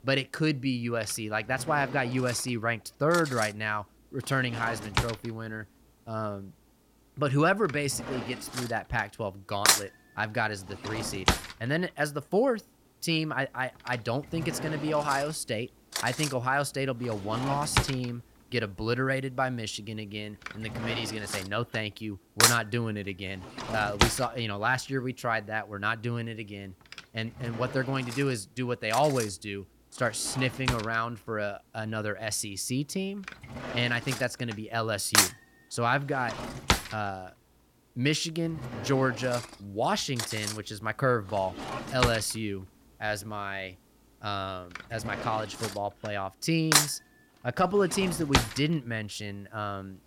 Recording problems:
household noises; loud; throughout; as loud as the speech

